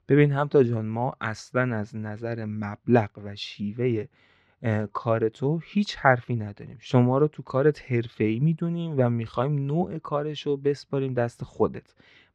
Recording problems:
muffled; slightly; fading above 4 kHz

